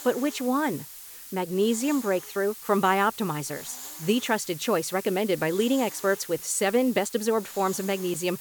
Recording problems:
hiss; noticeable; throughout; 15 dB below the speech

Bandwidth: 18.5 kHz